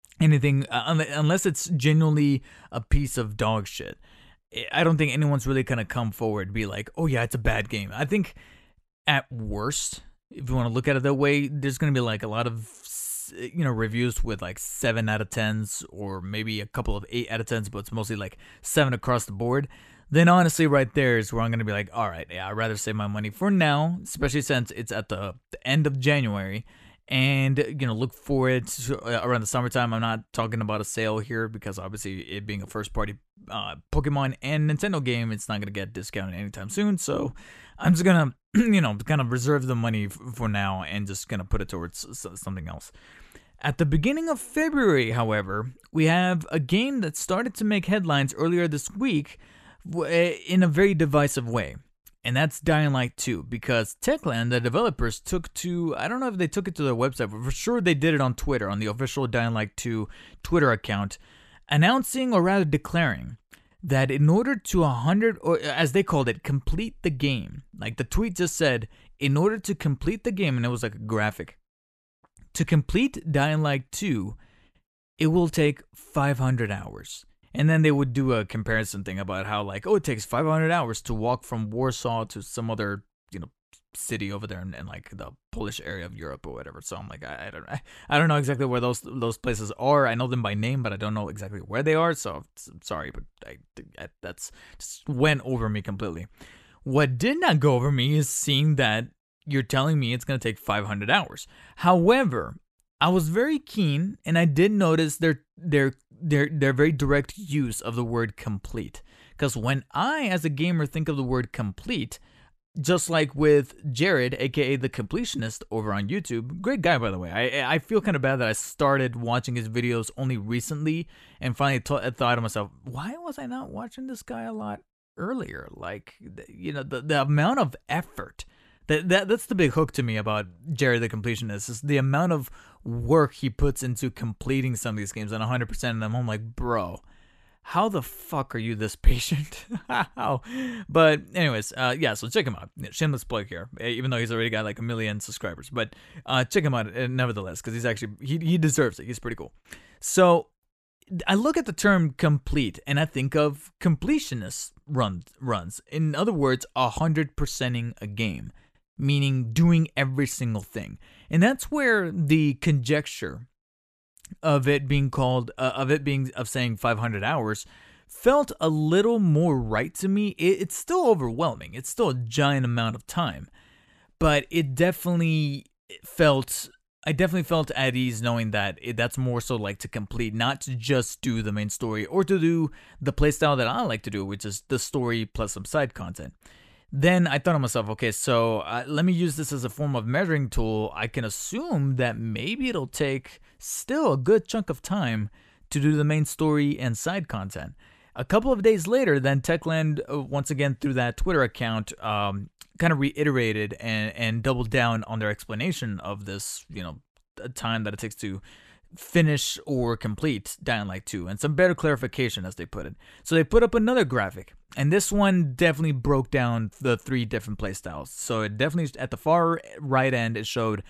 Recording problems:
none

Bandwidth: 14 kHz